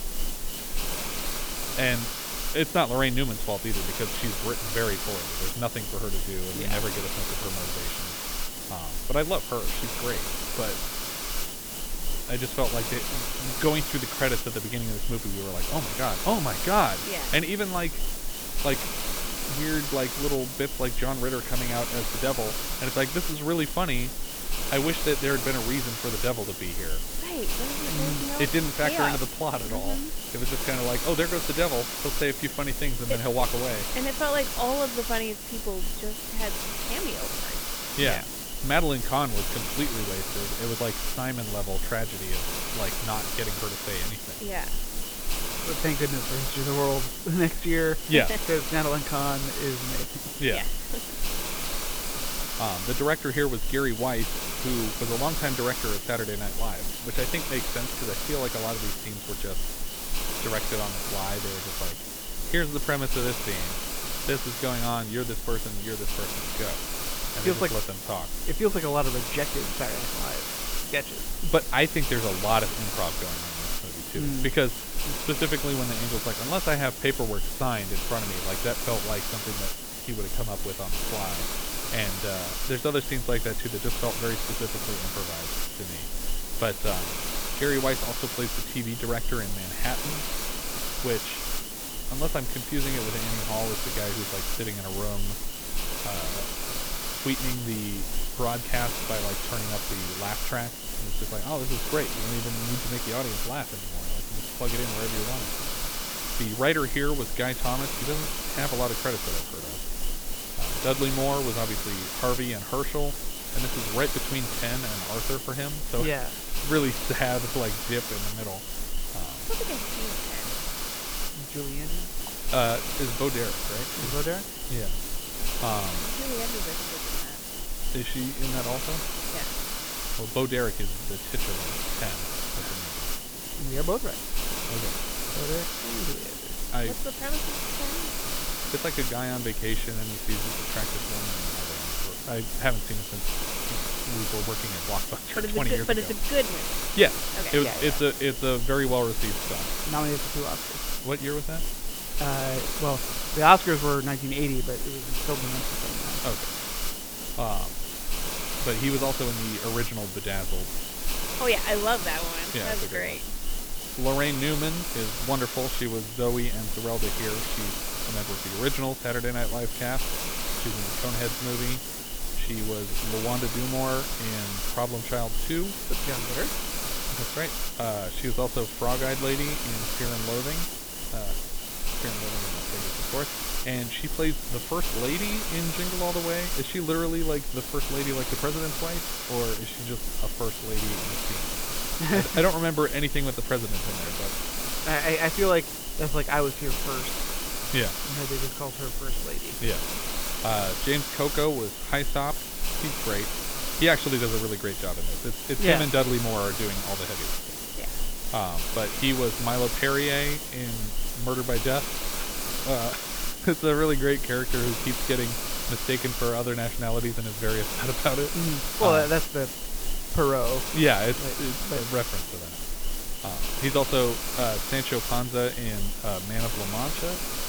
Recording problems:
high frequencies cut off; severe; nothing above 4 kHz
hiss; loud; throughout; 1 dB below the speech

